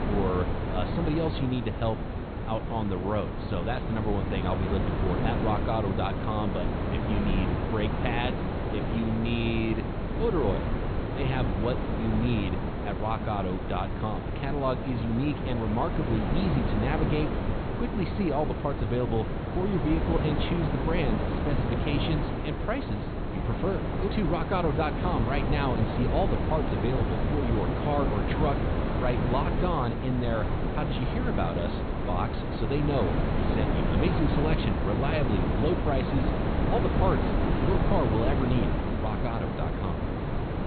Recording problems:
high frequencies cut off; severe; nothing above 4.5 kHz
wind noise on the microphone; heavy; 1 dB below the speech

